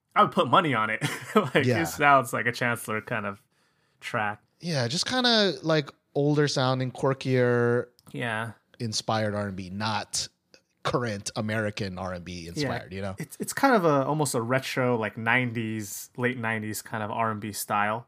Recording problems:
none

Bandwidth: 15 kHz